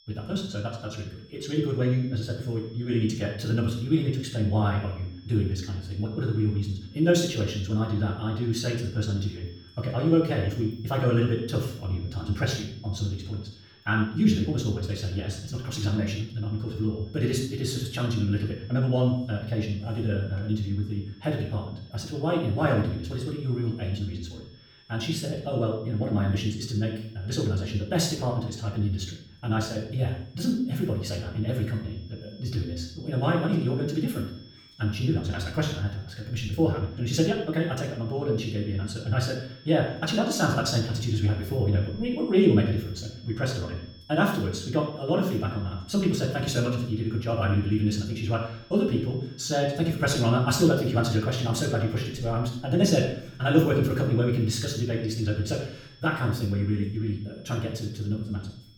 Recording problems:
wrong speed, natural pitch; too fast; 1.6 times normal speed
room echo; noticeable; dies away in 0.5 s
off-mic speech; somewhat distant
high-pitched whine; faint; throughout; 5.5 kHz, 25 dB below the speech

